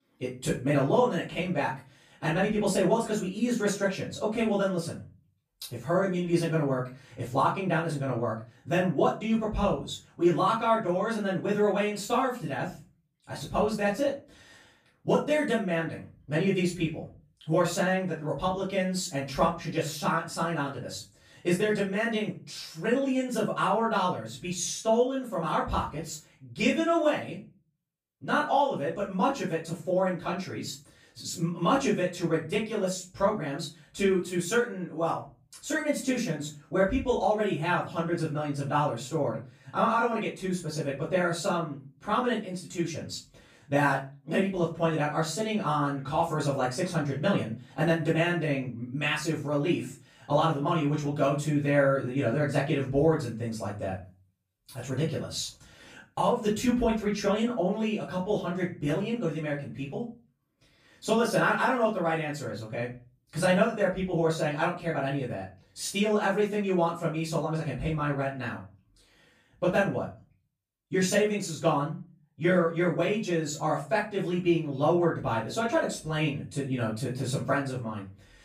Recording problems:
off-mic speech; far
room echo; slight; dies away in 0.3 s

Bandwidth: 15 kHz